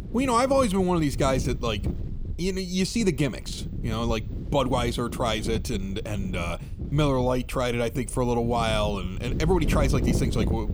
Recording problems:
wind noise on the microphone; occasional gusts; 15 dB below the speech

